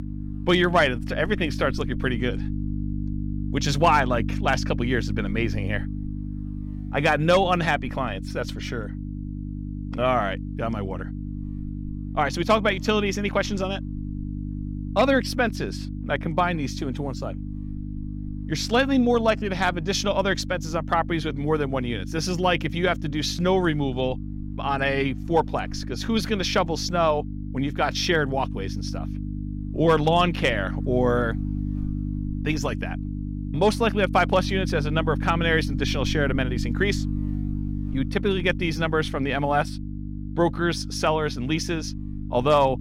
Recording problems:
electrical hum; noticeable; throughout; 50 Hz, 15 dB below the speech

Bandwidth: 16 kHz